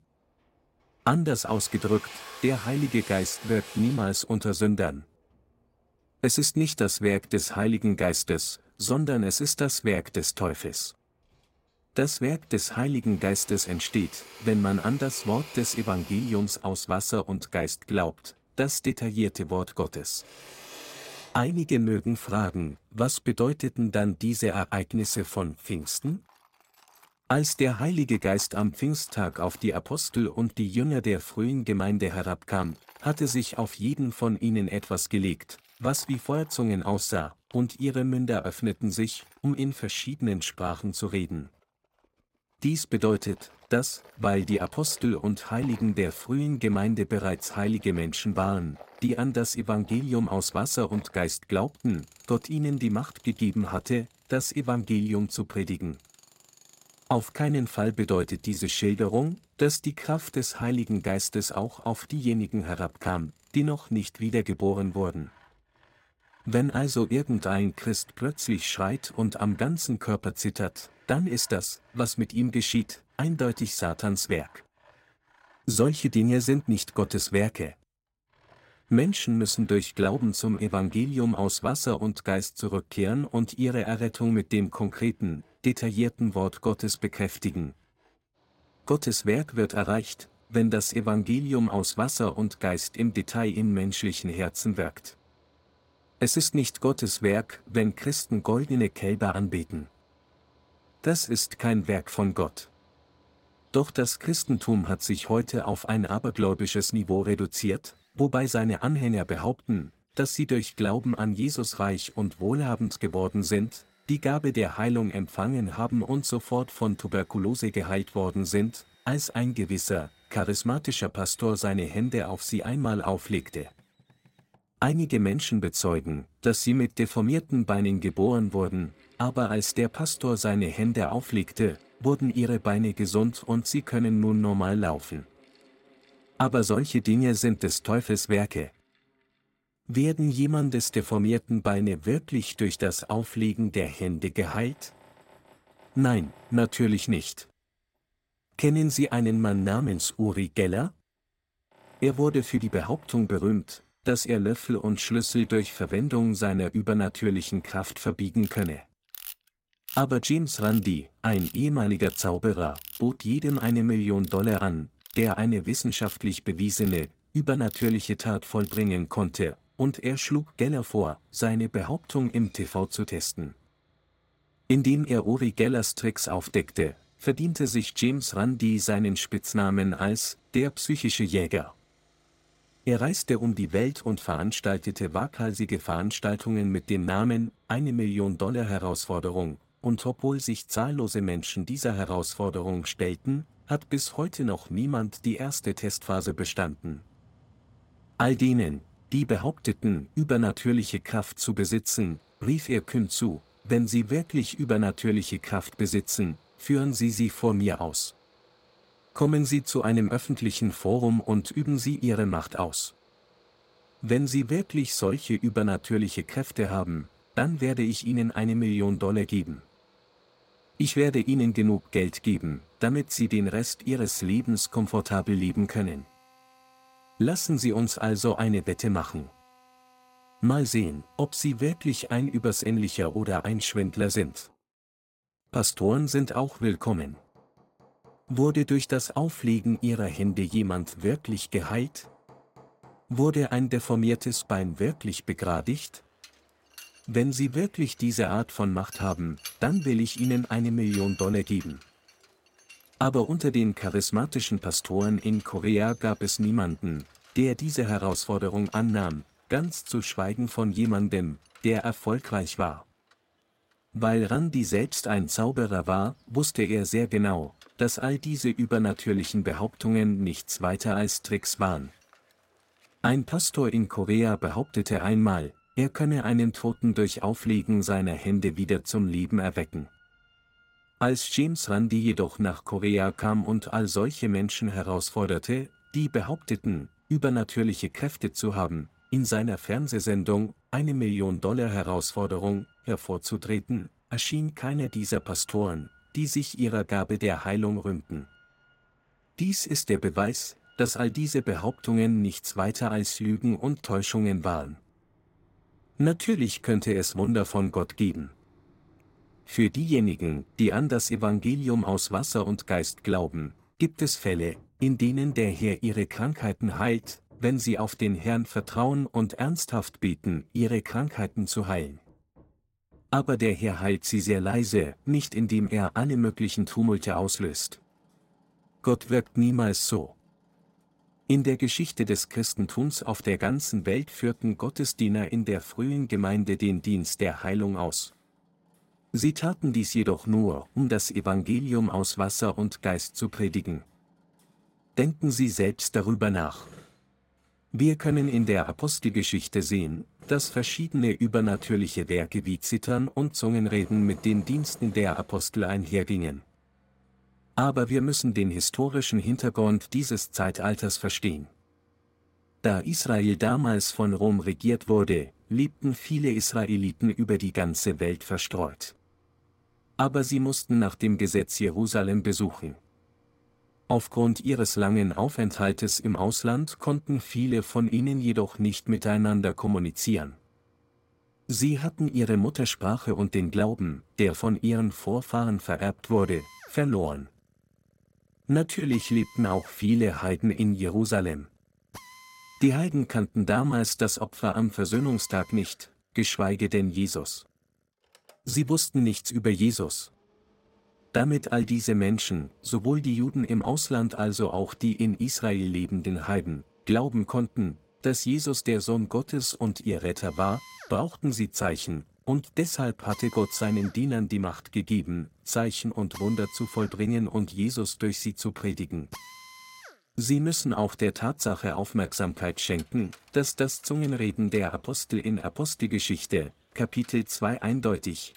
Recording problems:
machinery noise; faint; throughout; 25 dB below the speech

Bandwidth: 16 kHz